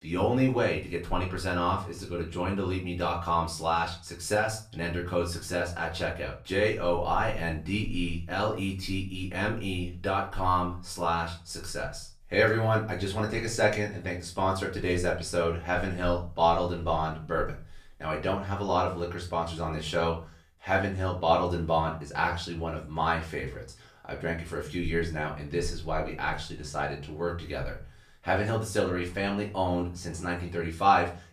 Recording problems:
off-mic speech; far
room echo; slight; dies away in 0.3 s

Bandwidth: 14.5 kHz